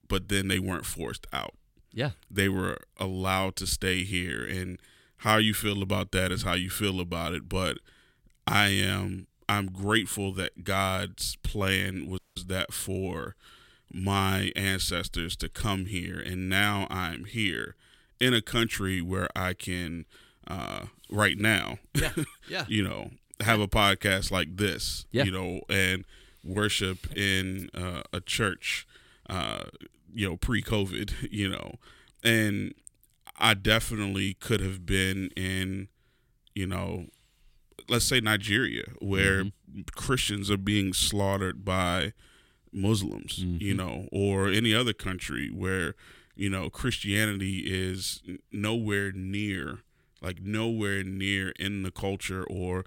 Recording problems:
audio cutting out; at 12 s

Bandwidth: 16.5 kHz